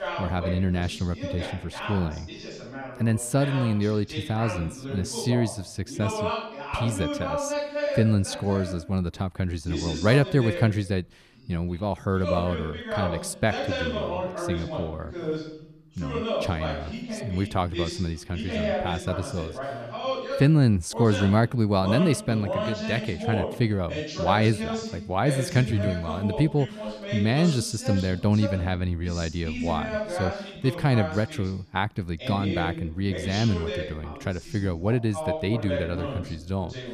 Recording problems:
voice in the background; loud; throughout; 6 dB below the speech

